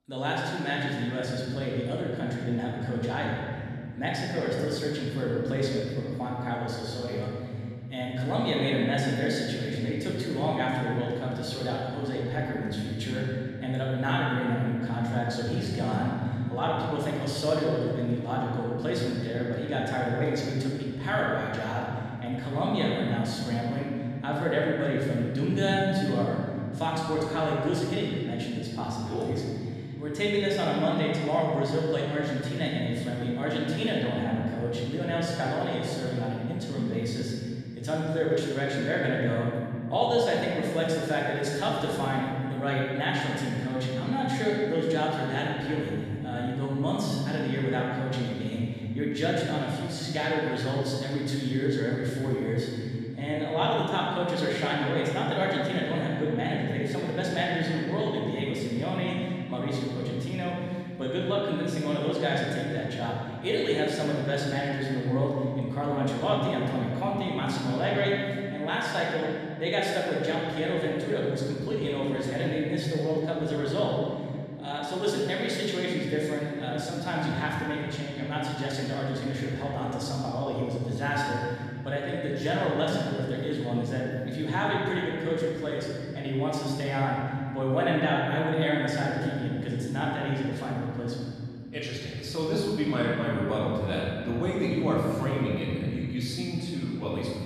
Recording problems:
room echo; strong; dies away in 2.9 s
off-mic speech; far

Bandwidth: 13.5 kHz